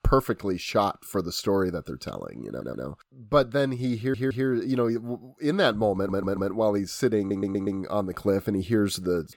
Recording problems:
audio stuttering; 4 times, first at 2.5 s

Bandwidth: 17 kHz